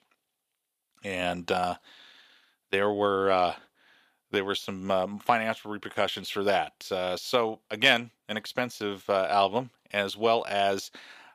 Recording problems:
thin; very; fading below 400 Hz

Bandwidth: 15 kHz